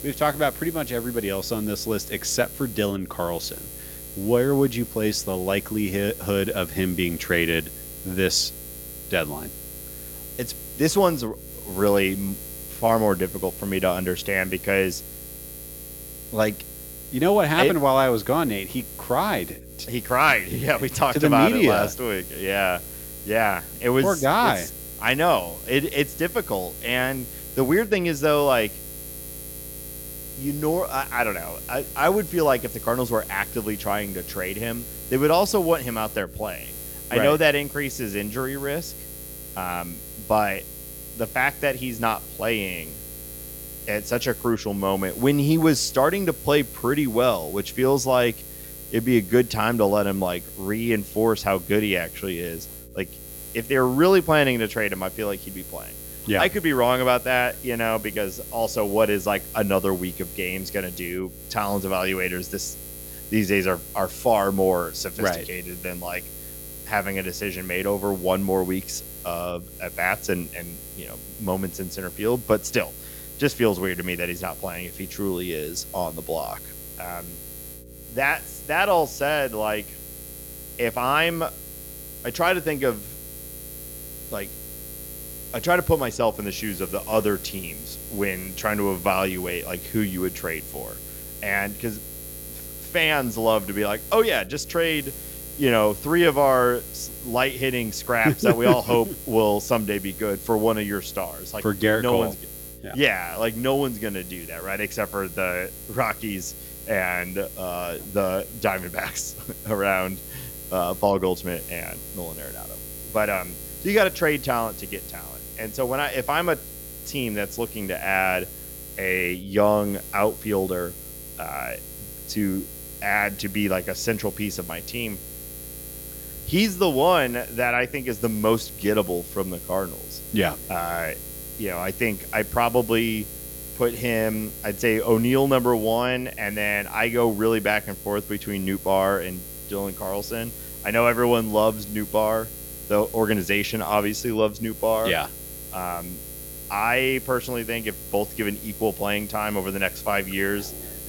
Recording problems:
electrical hum; noticeable; throughout; 60 Hz, 15 dB below the speech

